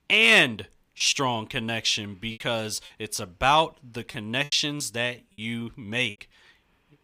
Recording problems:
choppy; very; 5% of the speech affected

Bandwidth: 15.5 kHz